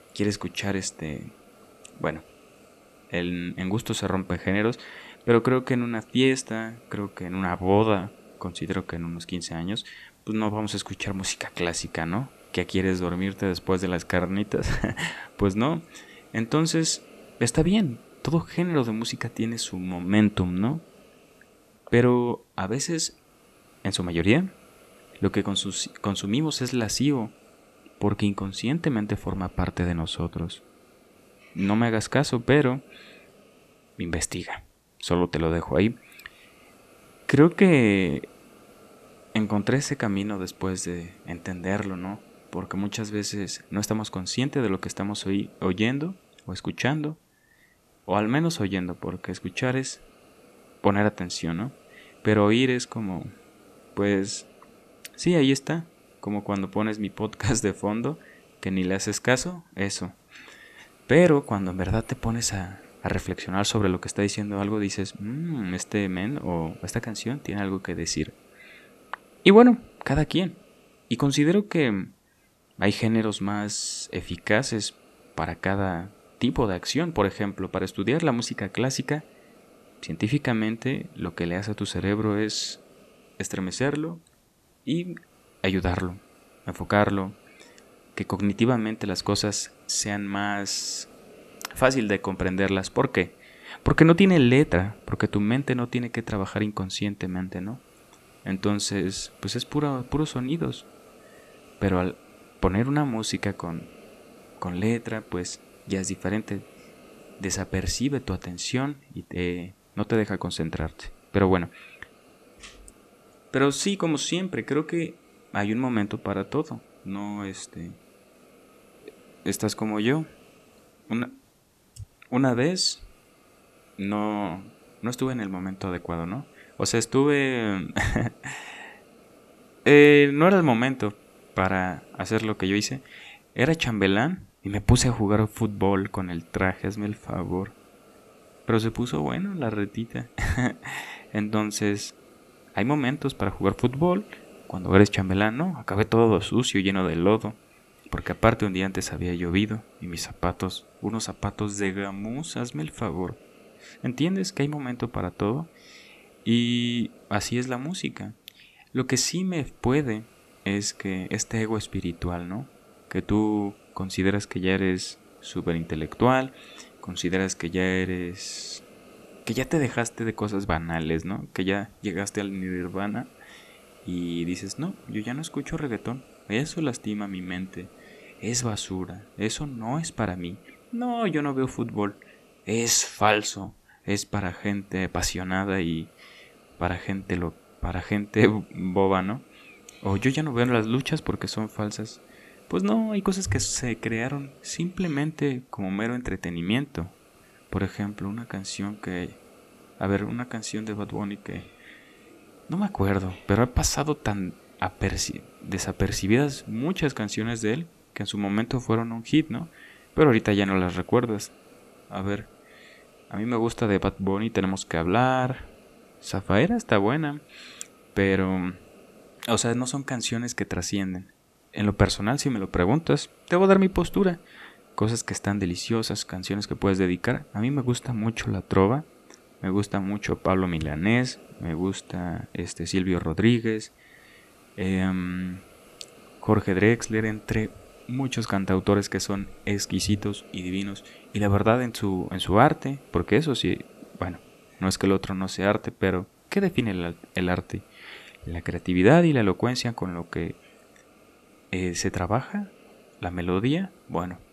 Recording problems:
hiss; faint; throughout; 25 dB below the speech

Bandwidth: 14 kHz